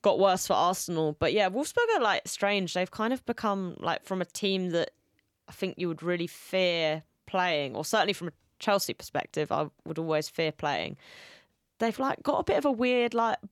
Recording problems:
none

